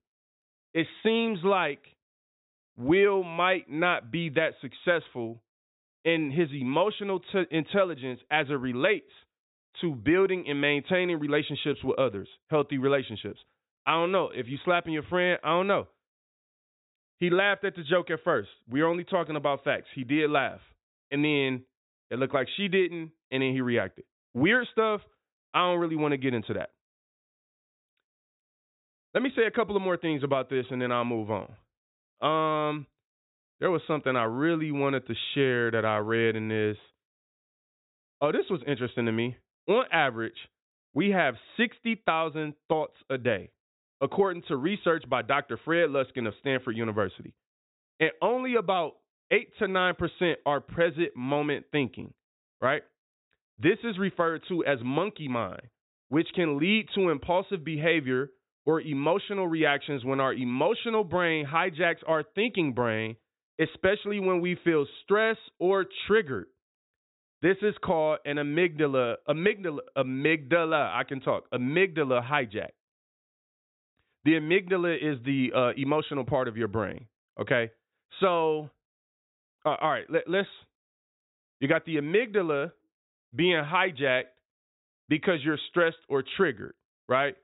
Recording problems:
high frequencies cut off; severe; nothing above 4 kHz

